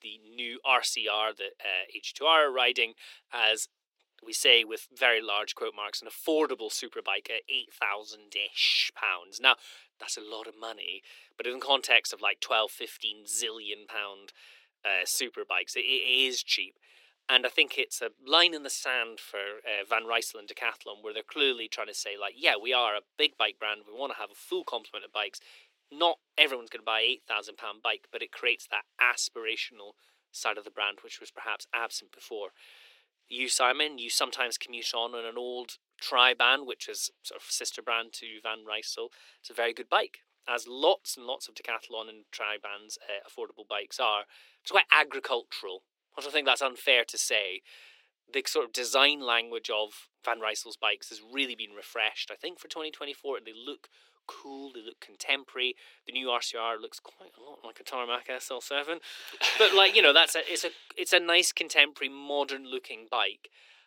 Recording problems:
thin; very; fading below 350 Hz

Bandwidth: 16.5 kHz